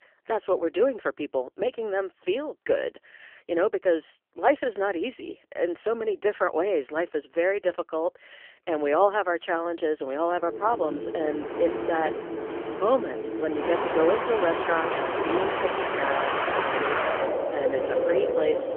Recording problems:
phone-call audio; poor line; nothing above 3 kHz
wind in the background; loud; from 10 s on; 1 dB below the speech

